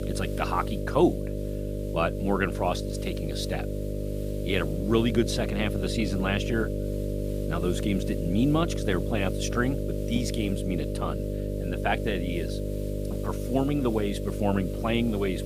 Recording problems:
electrical hum; loud; throughout; 50 Hz, 6 dB below the speech
hiss; faint; throughout; 25 dB below the speech

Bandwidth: 15 kHz